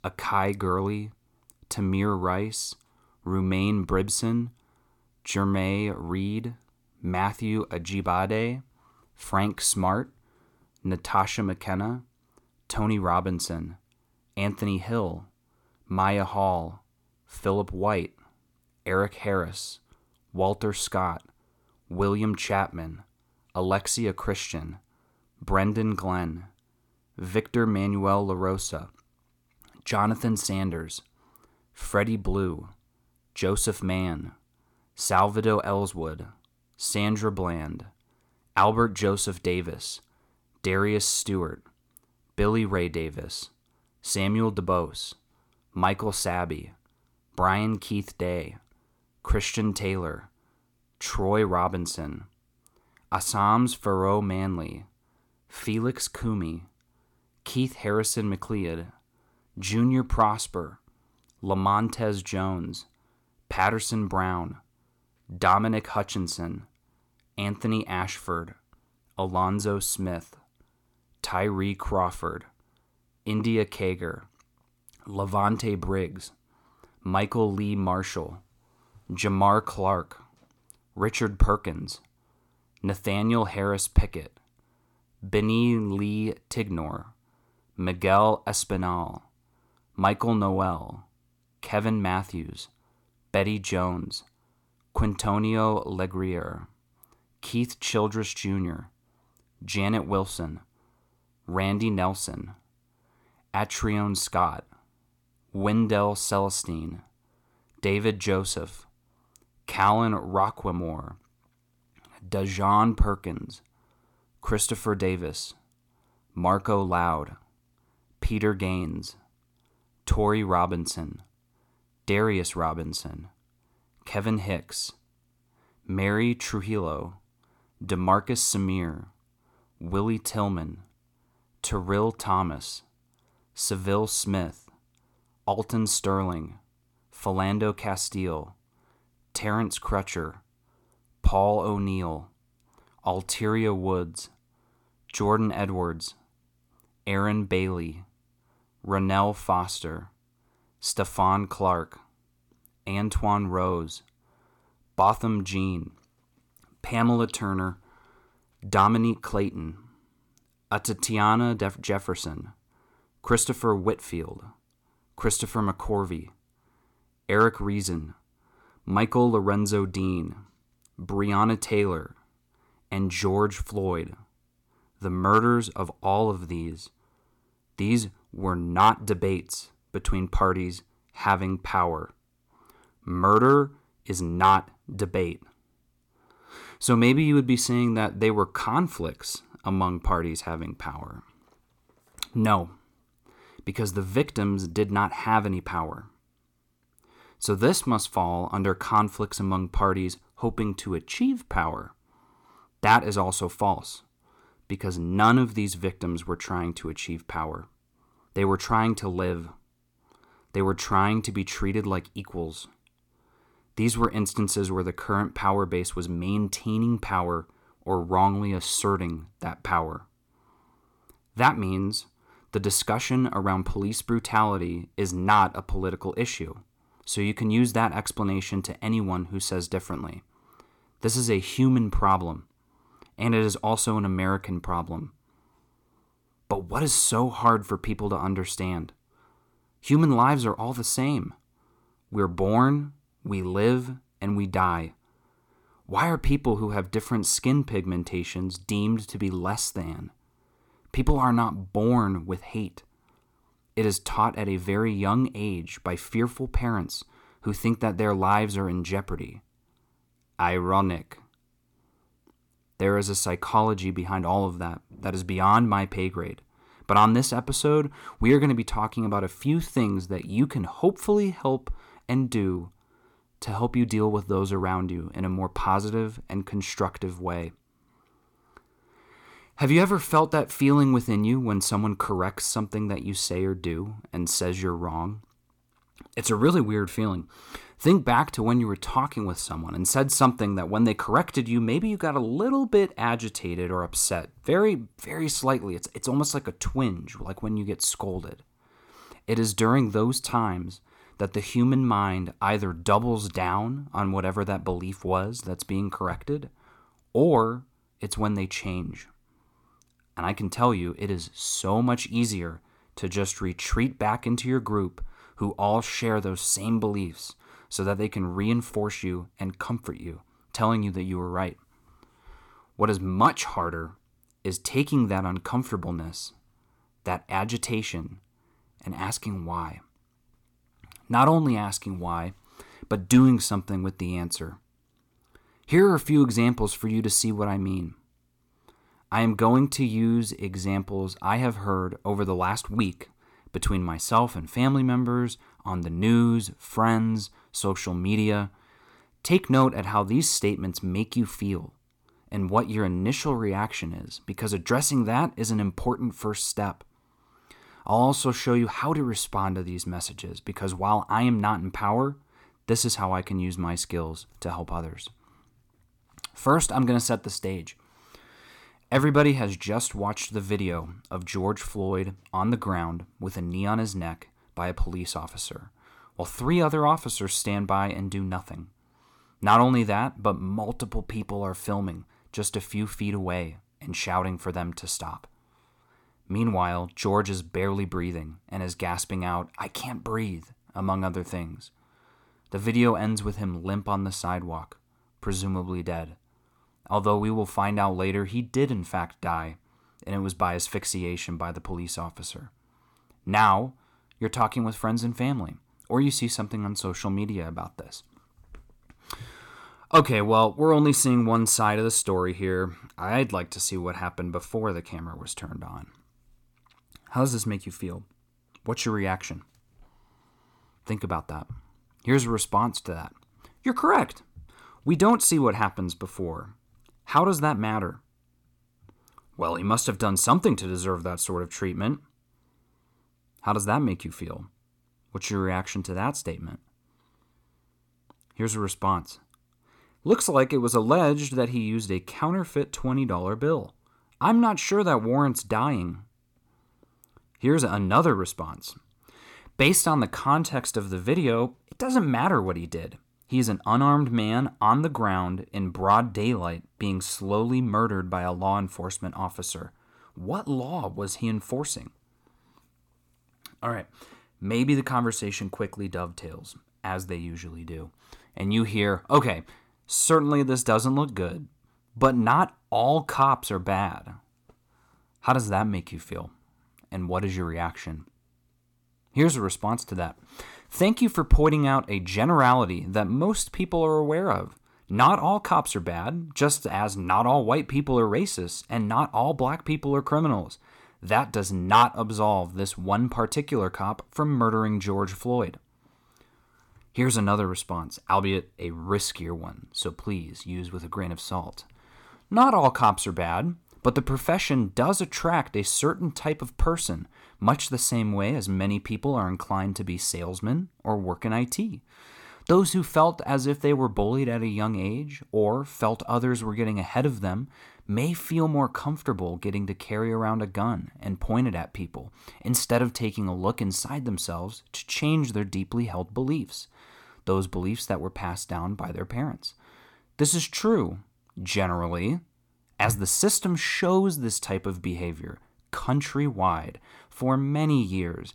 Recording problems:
none

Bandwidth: 17.5 kHz